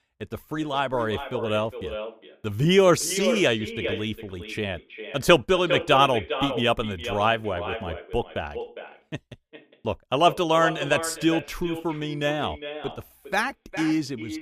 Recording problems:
echo of what is said; strong; throughout; 410 ms later, 9 dB below the speech

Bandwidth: 15 kHz